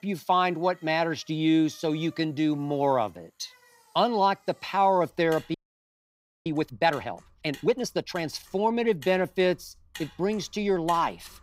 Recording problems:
traffic noise; faint; throughout; 25 dB below the speech
audio freezing; at 5.5 s for 1 s

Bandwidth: 15.5 kHz